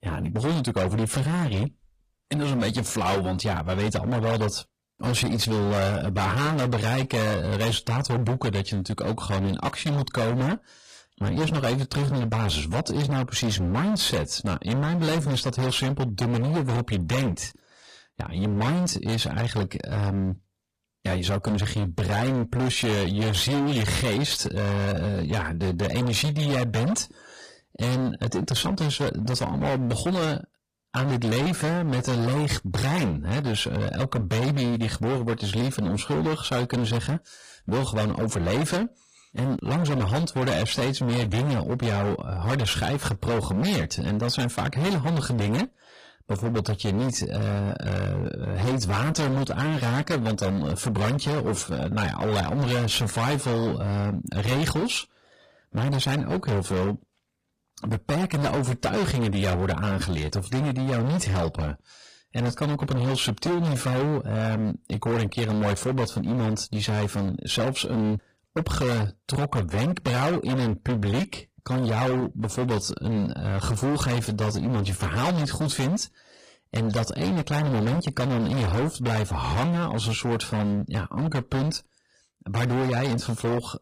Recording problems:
distortion; heavy; 29% of the sound clipped
garbled, watery; slightly; nothing above 14.5 kHz

